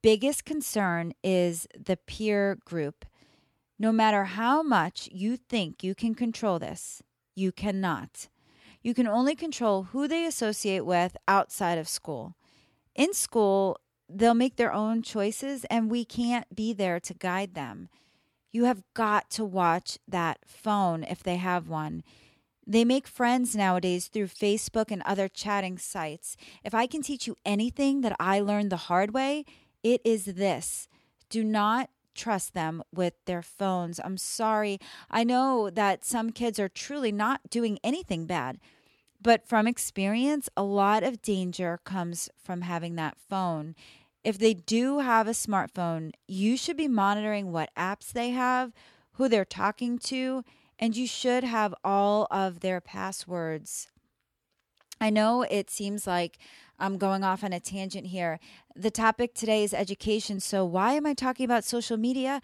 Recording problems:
none

